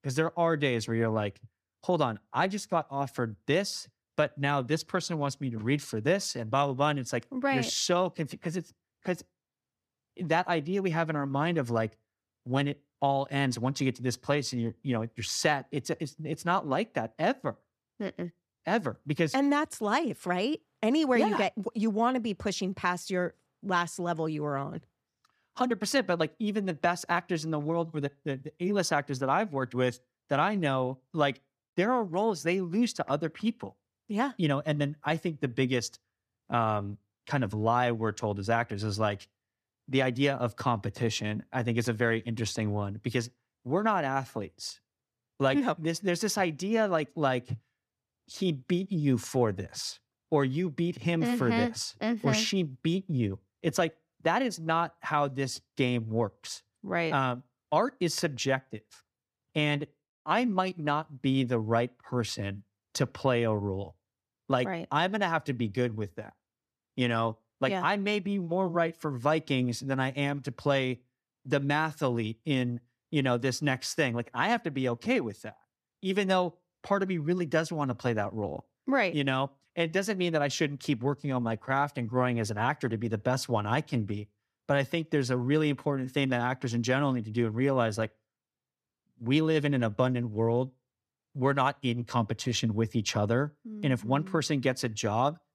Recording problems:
none

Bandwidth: 14.5 kHz